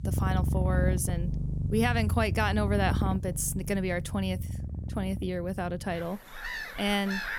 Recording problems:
animal sounds; loud; throughout; 1 dB below the speech

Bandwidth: 19 kHz